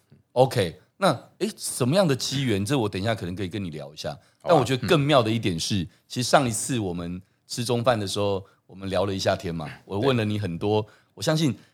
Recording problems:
none

